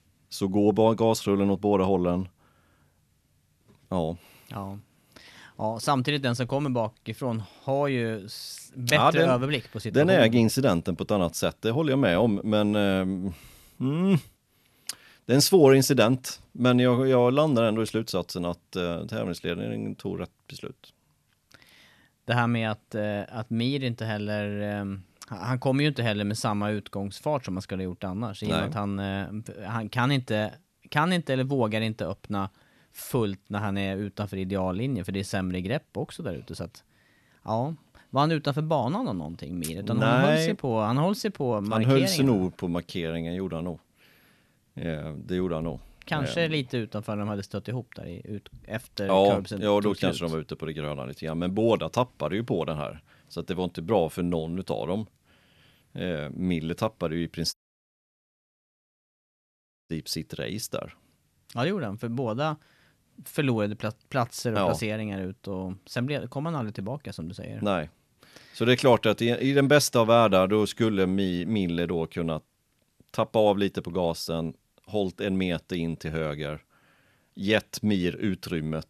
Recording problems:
audio cutting out; at 58 s for 2.5 s

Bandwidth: 13.5 kHz